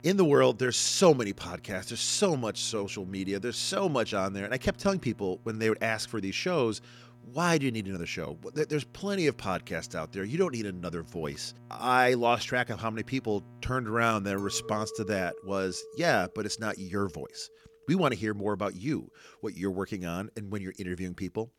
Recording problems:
electrical hum; faint; until 15 s; 60 Hz, 30 dB below the speech
clattering dishes; faint; from 14 to 18 s; peak 10 dB below the speech

